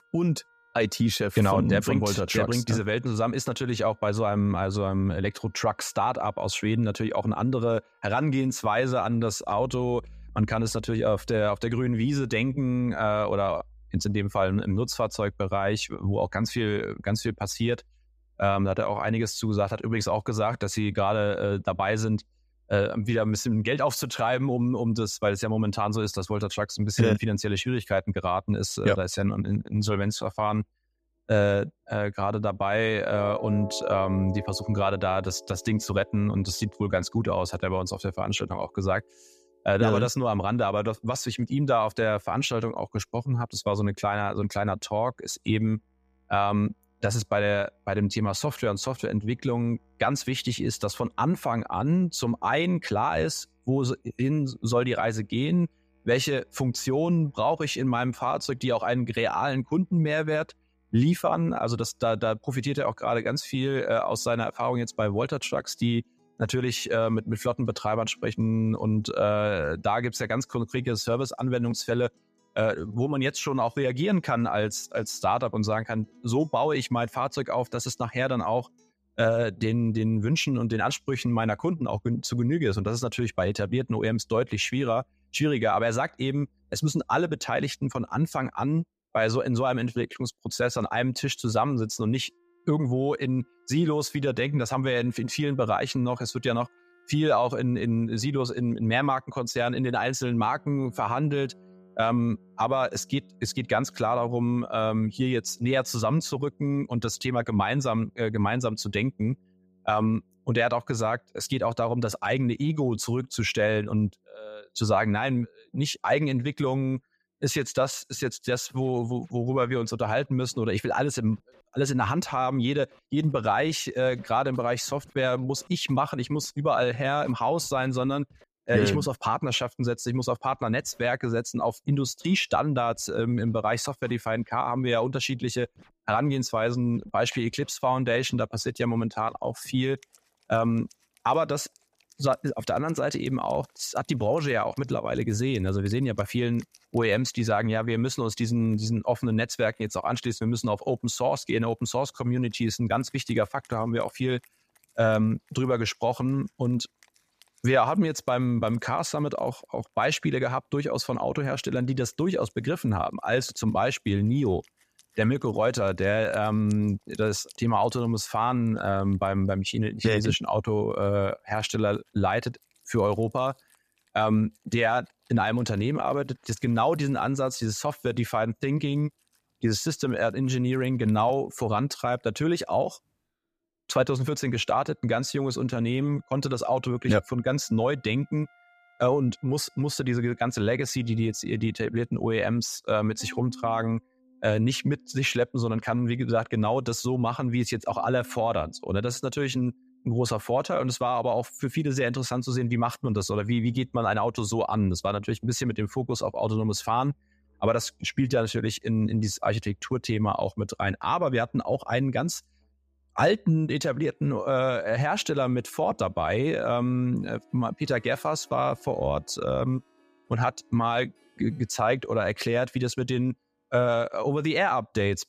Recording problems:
background music; faint; throughout; 25 dB below the speech

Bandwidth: 14.5 kHz